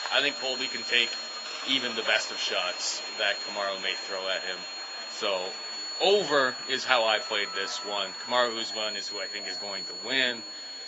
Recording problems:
garbled, watery; badly; nothing above 7.5 kHz
thin; very; fading below 550 Hz
high-pitched whine; loud; throughout; 4.5 kHz, 7 dB below the speech
train or aircraft noise; noticeable; throughout; 15 dB below the speech
background chatter; faint; throughout; 2 voices, 25 dB below the speech

